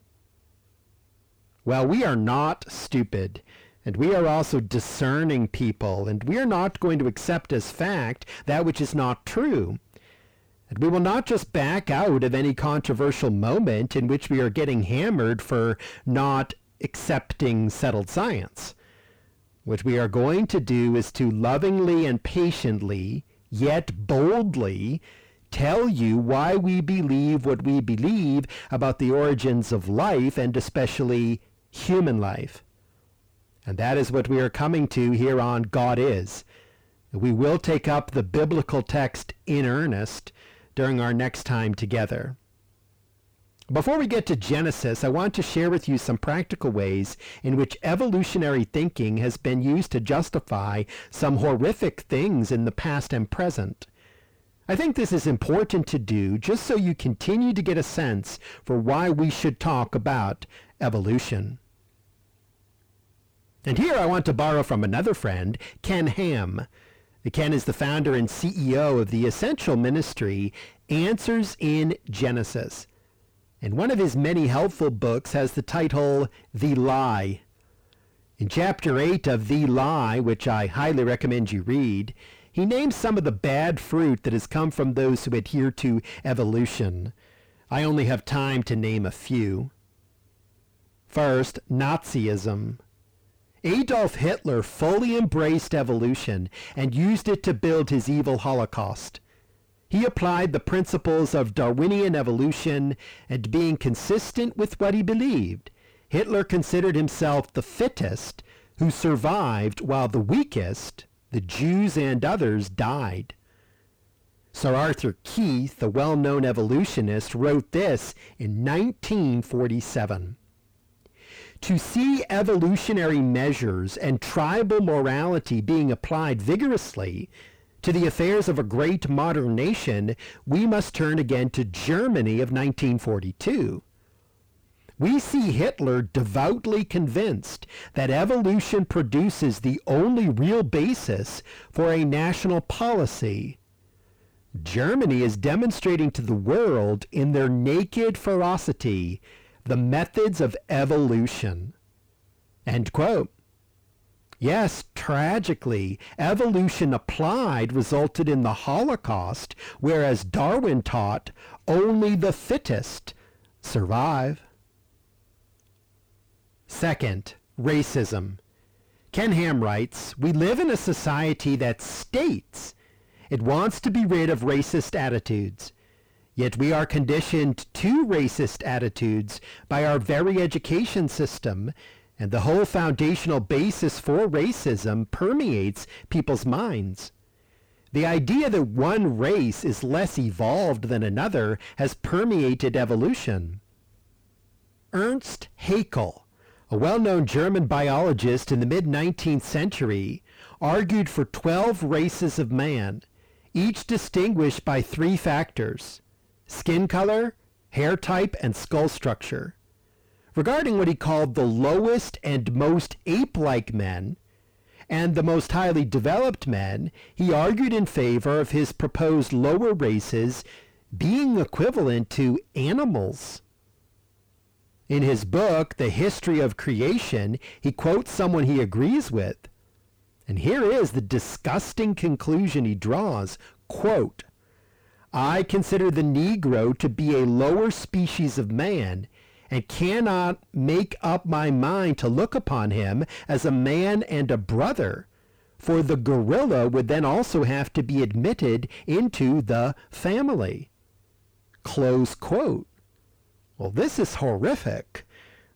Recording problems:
distortion; heavy; 5 dB below the speech

